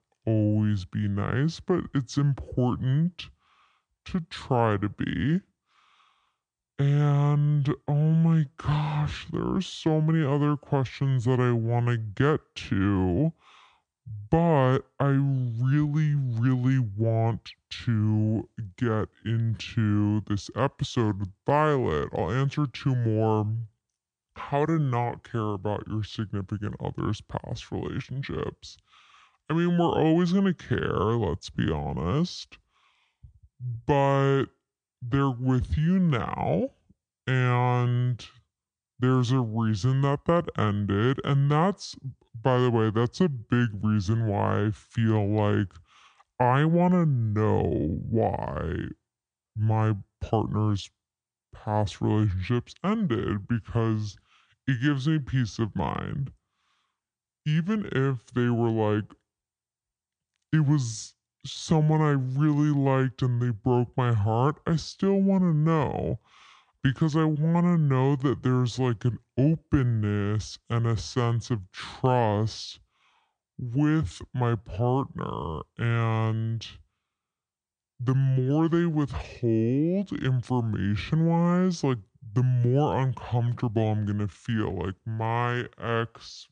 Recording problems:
wrong speed and pitch; too slow and too low; 0.7 times normal speed

